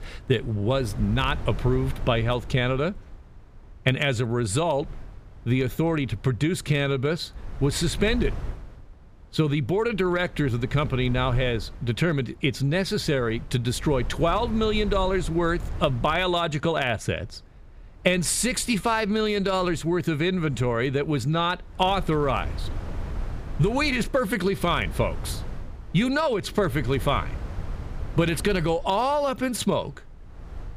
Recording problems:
wind noise on the microphone; occasional gusts; 20 dB below the speech

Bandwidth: 15 kHz